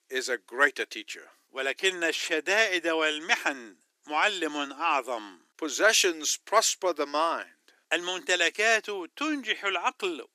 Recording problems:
thin; very; fading below 350 Hz

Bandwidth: 14.5 kHz